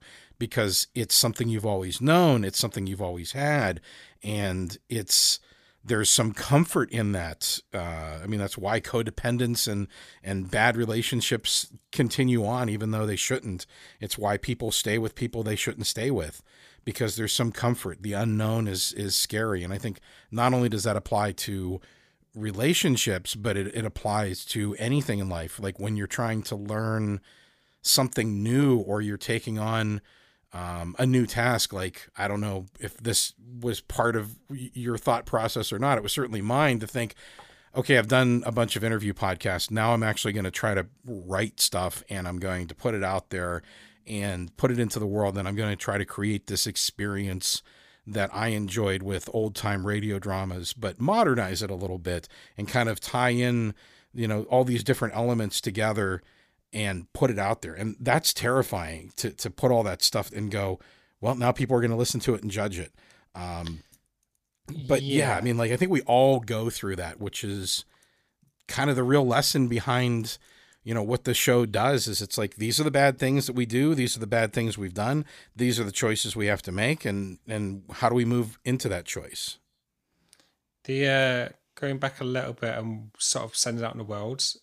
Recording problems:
none

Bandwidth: 15 kHz